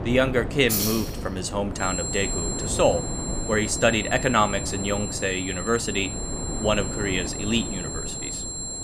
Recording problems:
high-pitched whine; loud; from 2 s on; 7.5 kHz, 6 dB below the speech
wind noise on the microphone; occasional gusts; 15 dB below the speech
jangling keys; loud; from 0.5 to 2 s; peak 1 dB above the speech

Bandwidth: 15 kHz